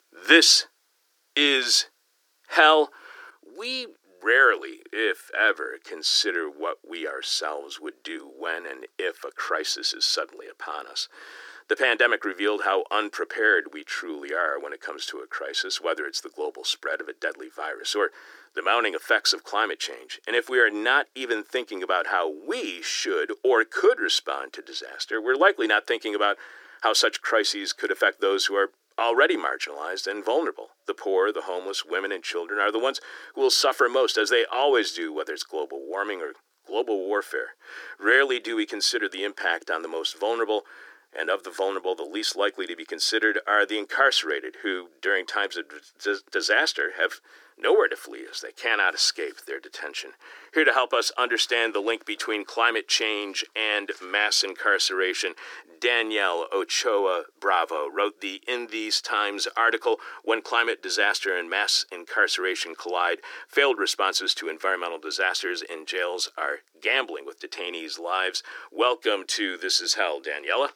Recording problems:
thin; very; fading below 300 Hz

